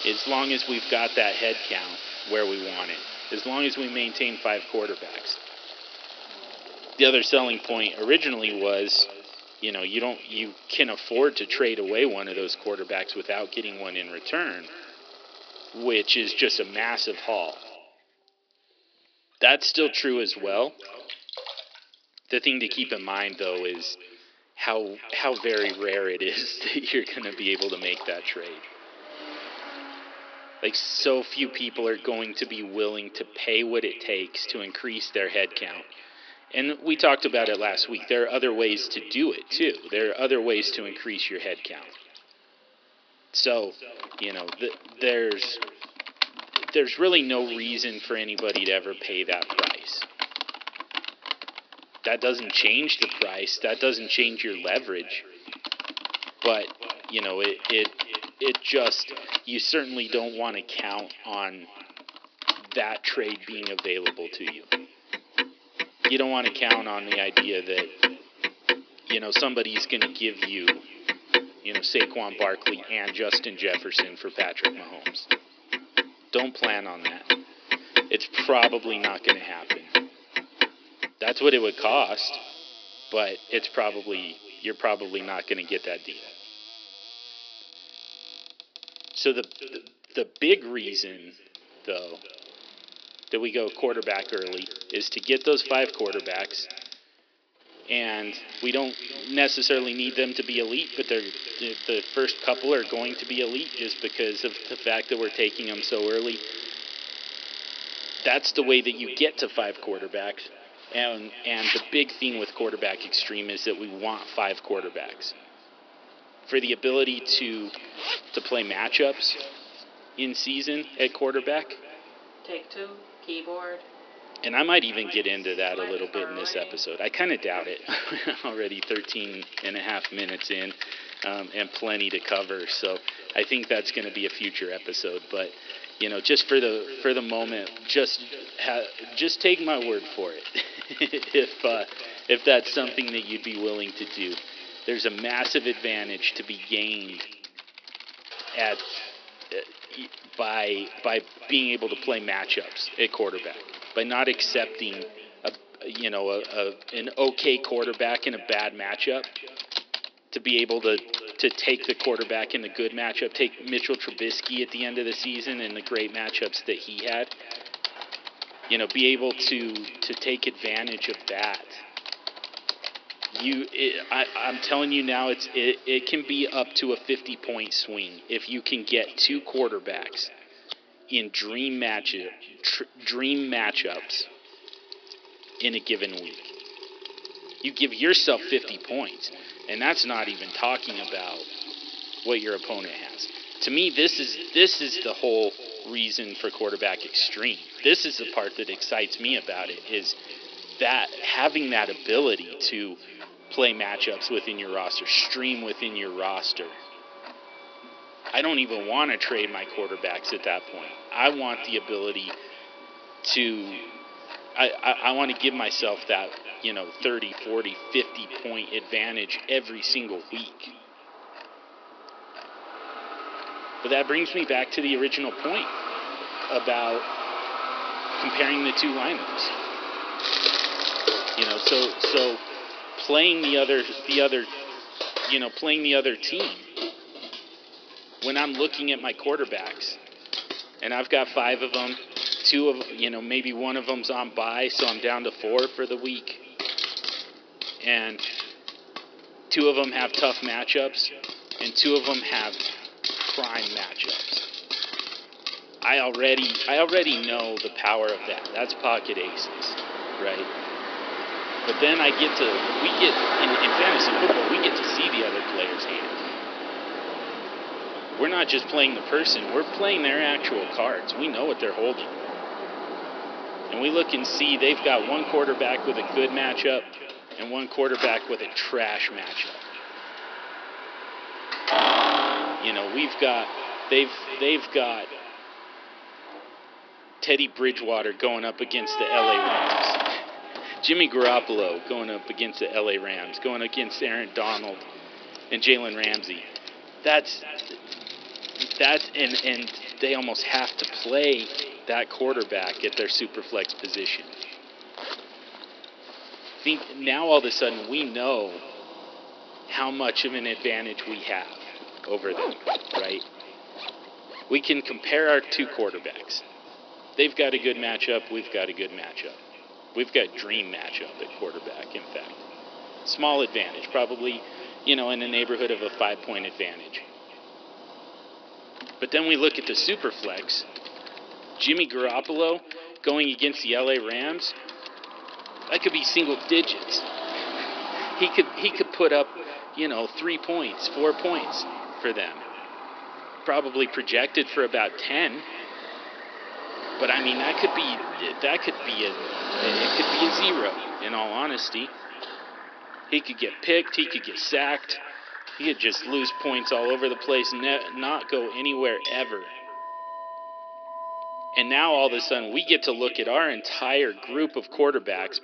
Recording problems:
echo of what is said; noticeable; throughout; 360 ms later, 15 dB below the speech
thin; somewhat; fading below 300 Hz
high frequencies cut off; noticeable; nothing above 5.5 kHz
household noises; loud; throughout; 7 dB below the speech
traffic noise; noticeable; throughout; 10 dB below the speech

